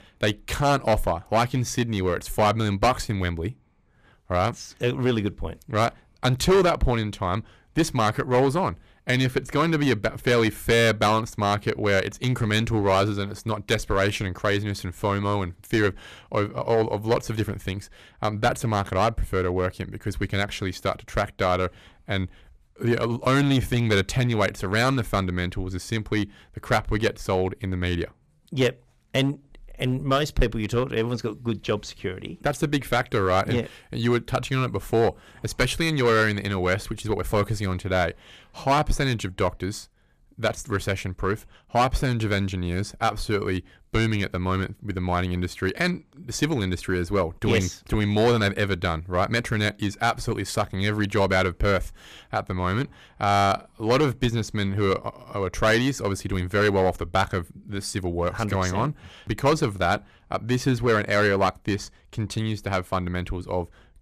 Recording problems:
distortion; slight; 5% of the sound clipped

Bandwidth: 14.5 kHz